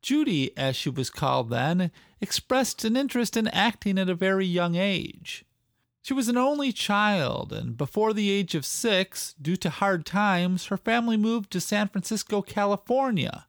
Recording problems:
none

